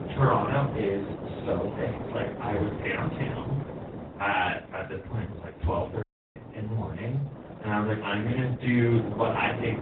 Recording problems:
off-mic speech; far
garbled, watery; badly
room echo; slight; dies away in 0.3 s
wind noise on the microphone; occasional gusts; 10 dB below the speech
audio cutting out; at 6 s

